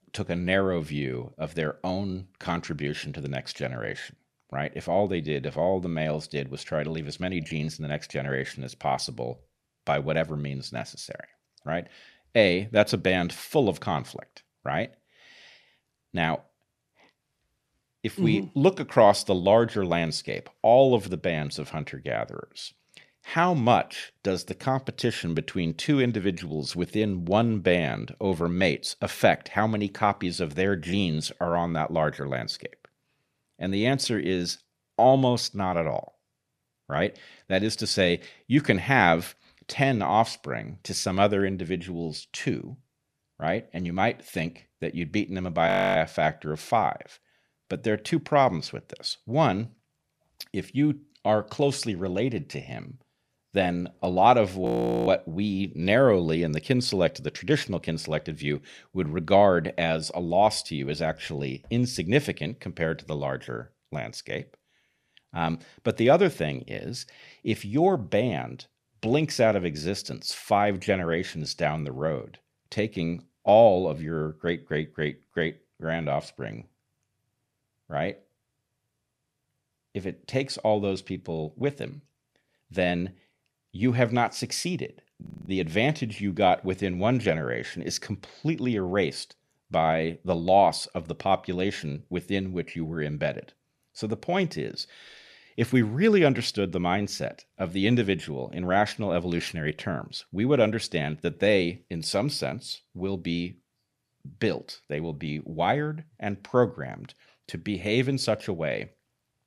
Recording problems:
audio freezing; at 46 s, at 55 s and at 1:25

